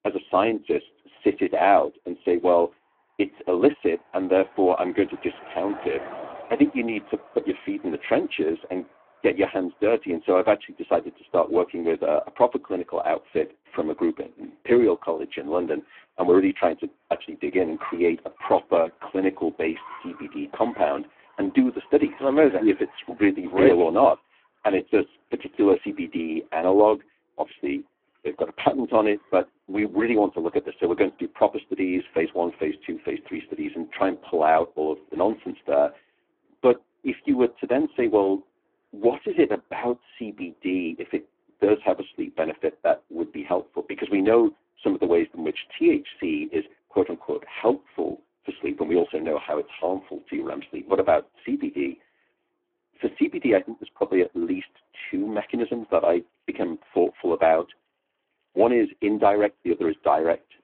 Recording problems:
phone-call audio; poor line
traffic noise; faint; throughout; 20 dB below the speech

